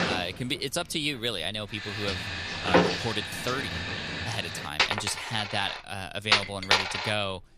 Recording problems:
household noises; very loud; throughout; 3 dB above the speech

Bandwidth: 14.5 kHz